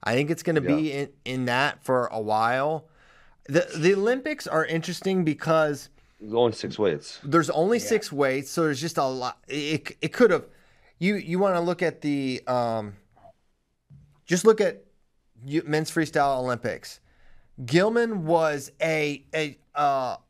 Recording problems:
none

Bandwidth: 15.5 kHz